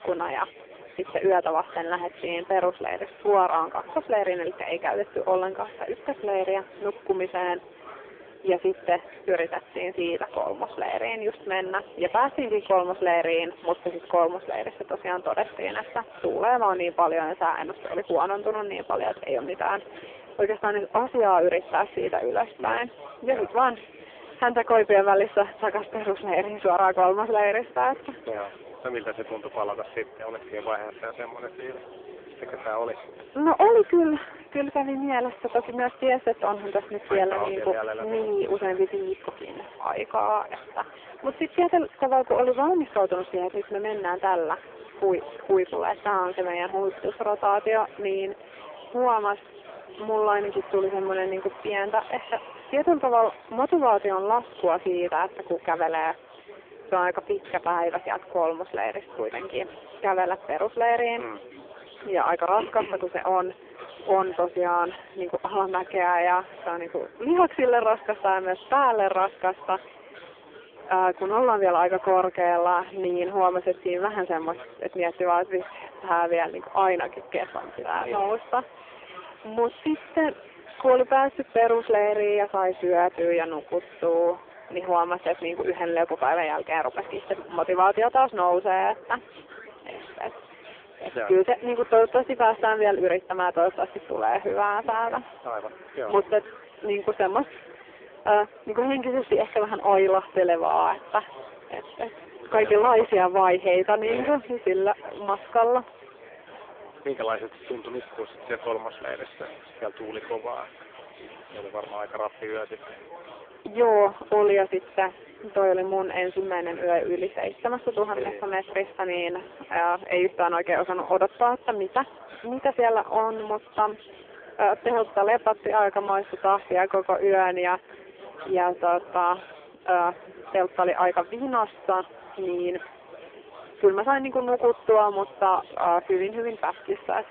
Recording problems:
phone-call audio; poor line
distortion; slight; 15 dB below the speech
murmuring crowd; noticeable; throughout; 20 dB below the speech

